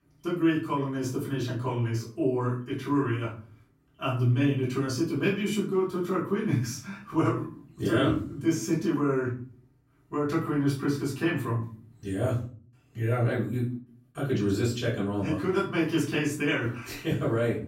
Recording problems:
off-mic speech; far
room echo; slight; dies away in 0.4 s

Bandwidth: 16 kHz